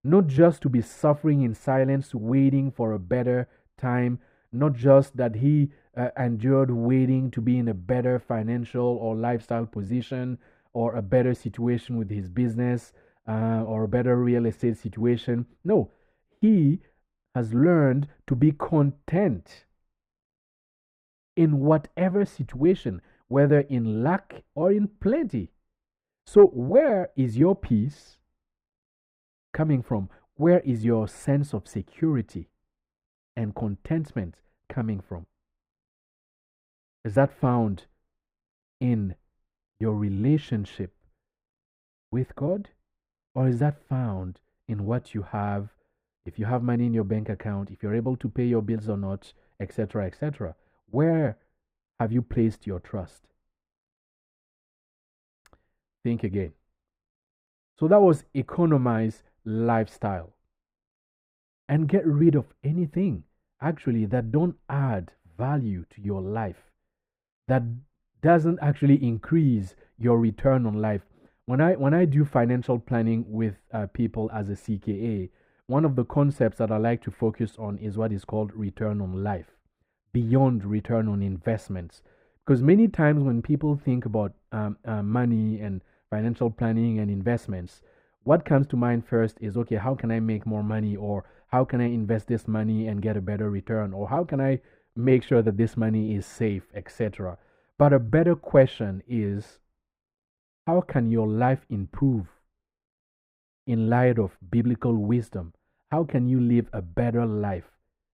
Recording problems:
muffled; very; fading above 2.5 kHz

